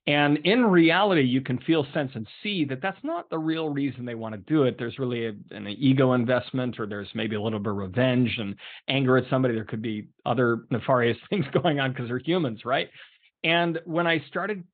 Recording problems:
high frequencies cut off; severe; nothing above 4 kHz

